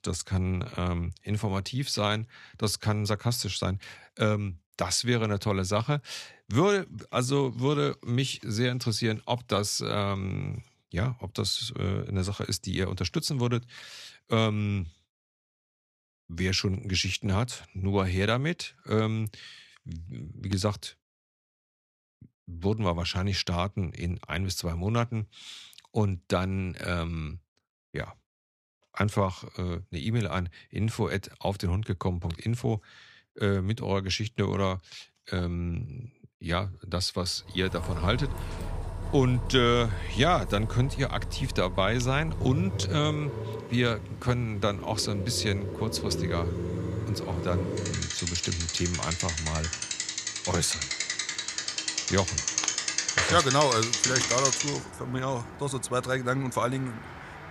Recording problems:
traffic noise; loud; from 38 s on; 2 dB below the speech

